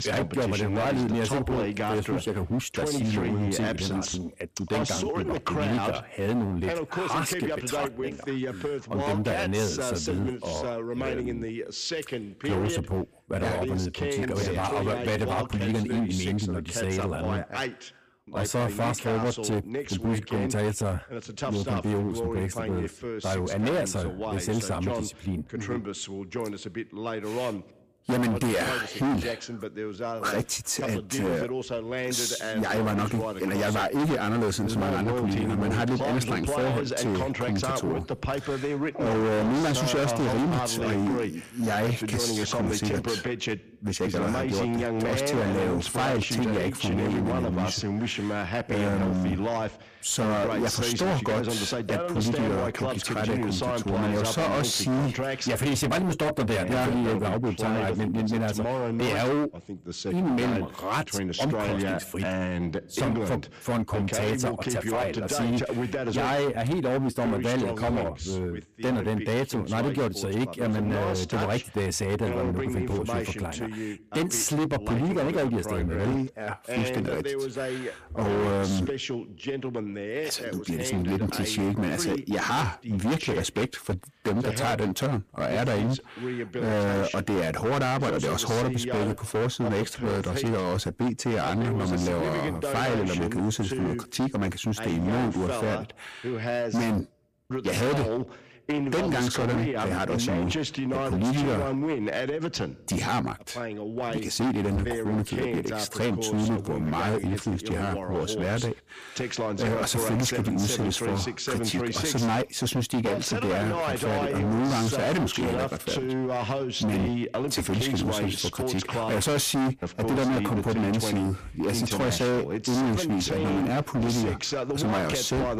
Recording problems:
distortion; heavy; 21% of the sound clipped
voice in the background; loud; throughout; 4 dB below the speech

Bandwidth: 15 kHz